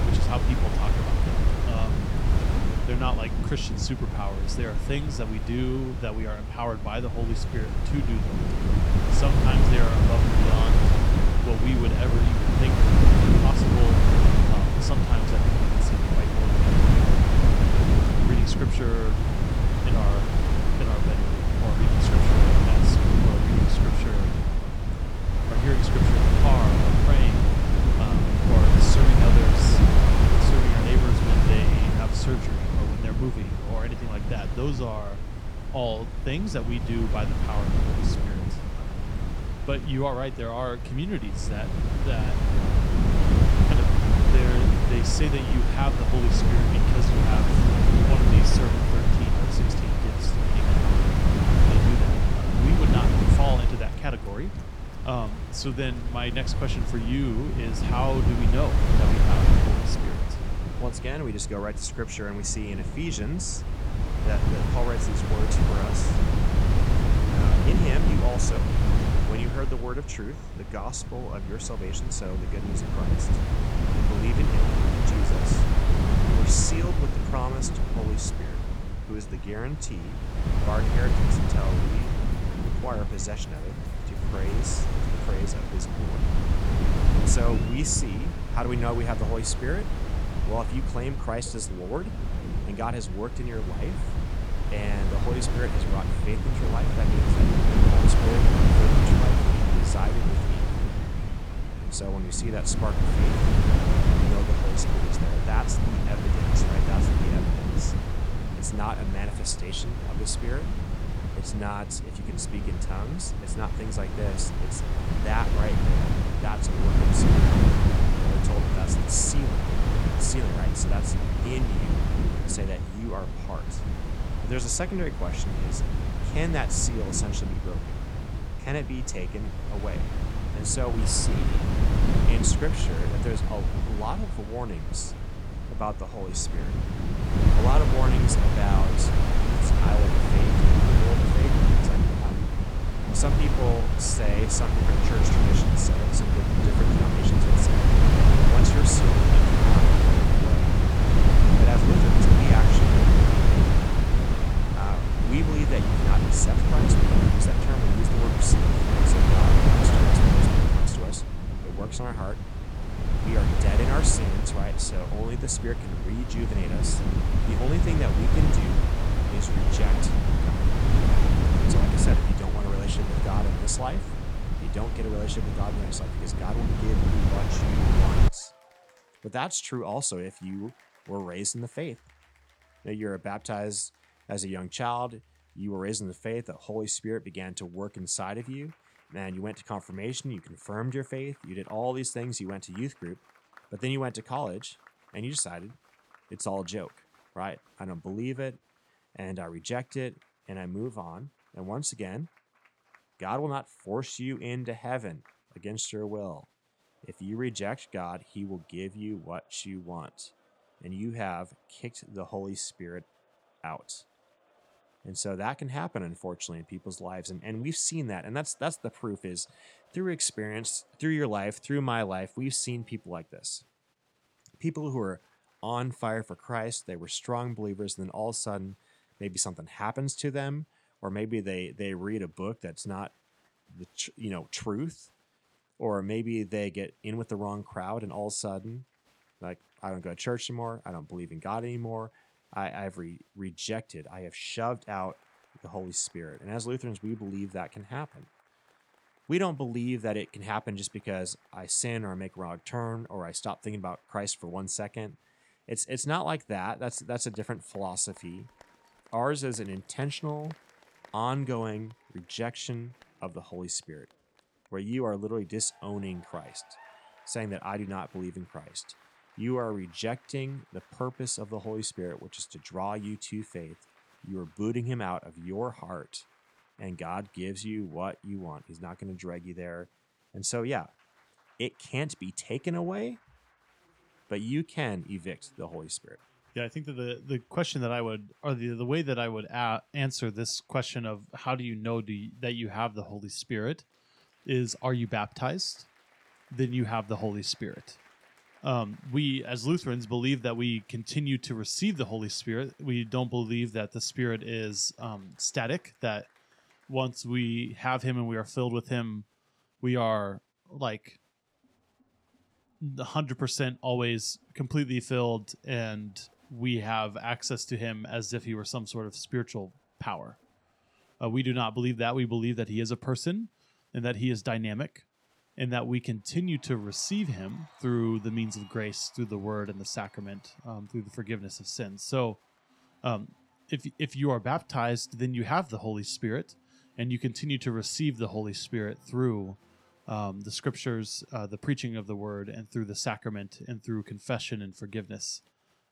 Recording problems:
wind noise on the microphone; heavy; until 2:58; 2 dB above the speech
crowd noise; faint; throughout; 30 dB below the speech

